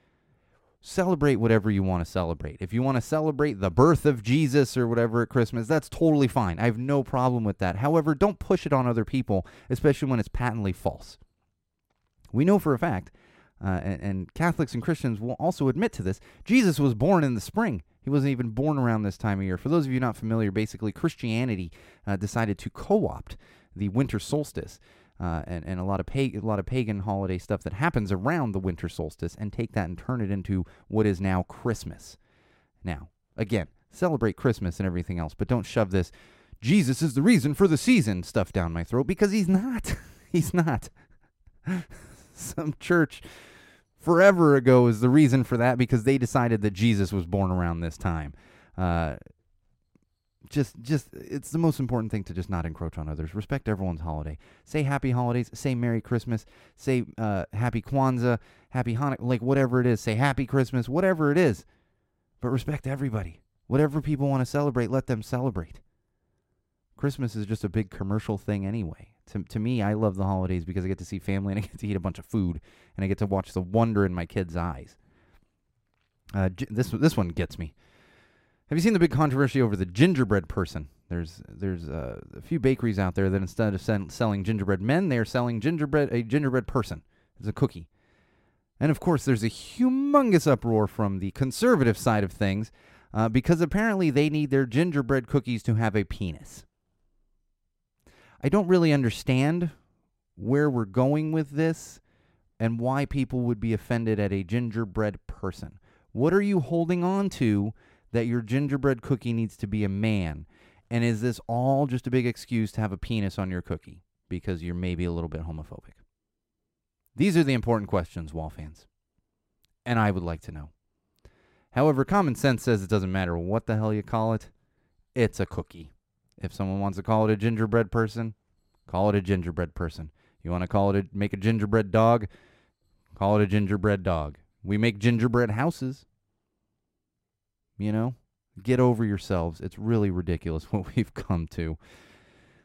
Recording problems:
none

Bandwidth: 16 kHz